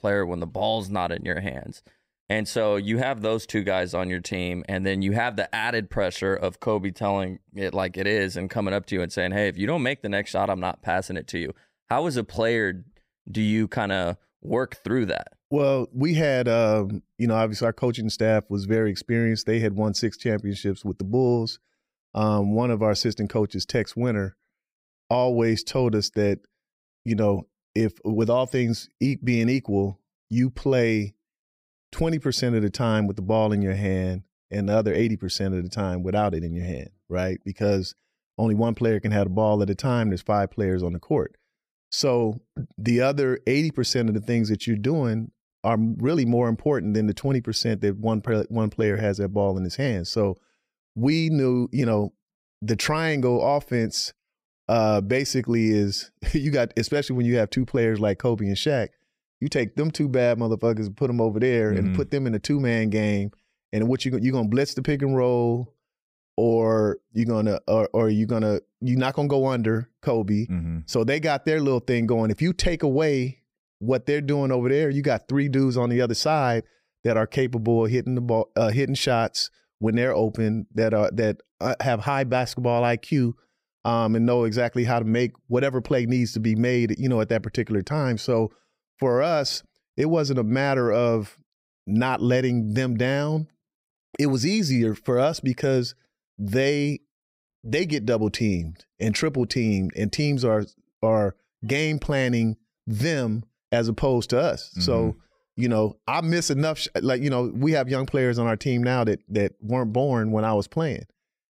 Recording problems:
none

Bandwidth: 15.5 kHz